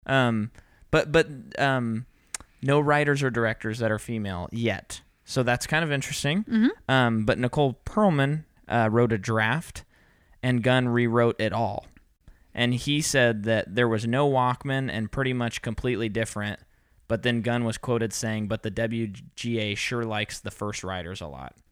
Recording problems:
none

